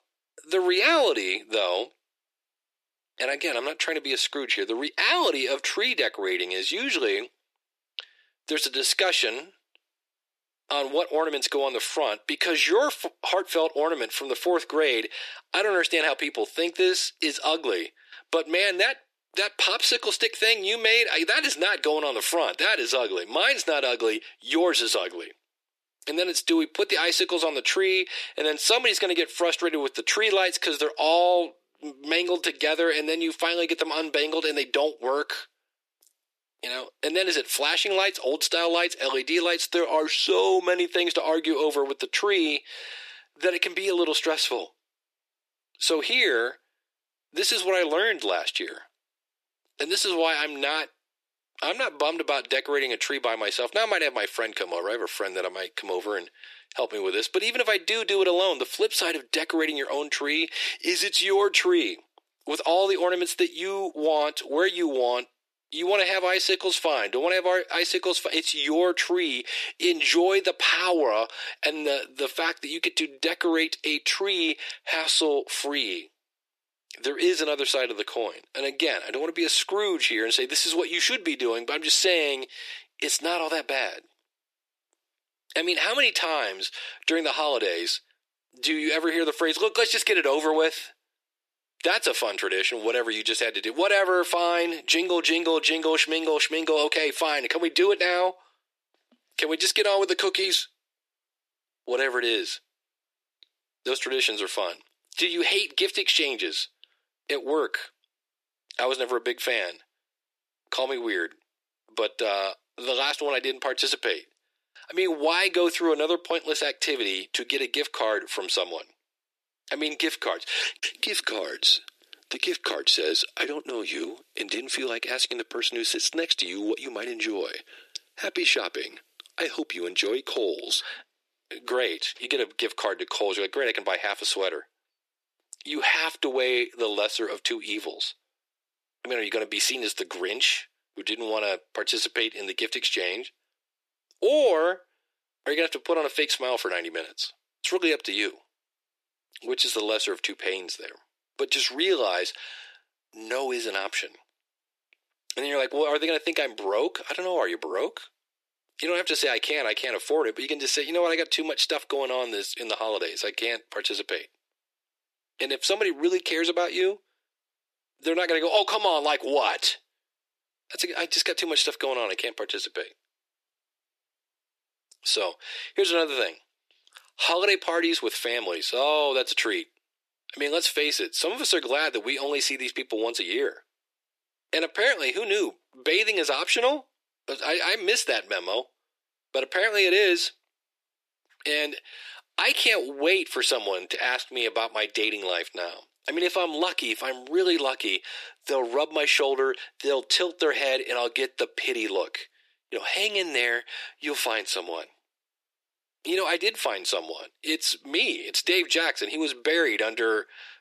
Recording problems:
thin; very; fading below 350 Hz

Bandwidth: 14 kHz